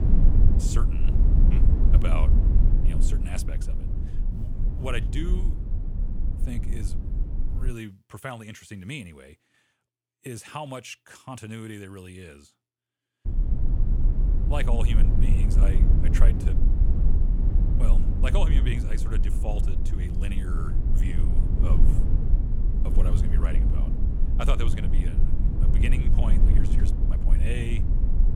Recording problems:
low rumble; loud; until 7.5 s and from 13 s on; 3 dB below the speech

